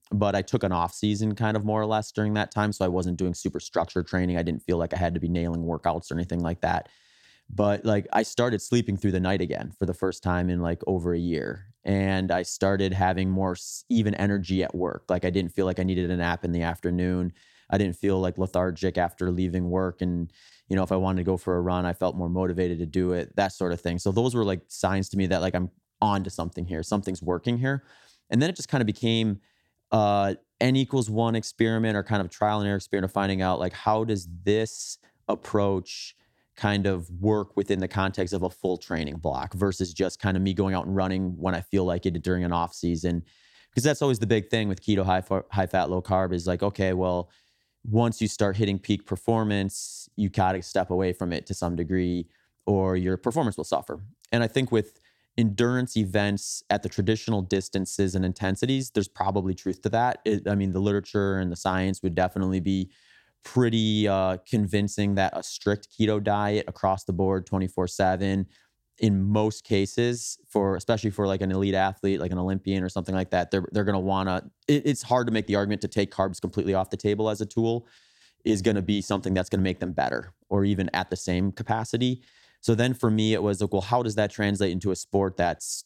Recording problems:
none

